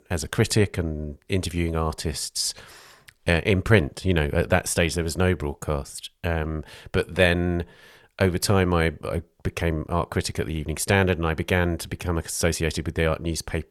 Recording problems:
none

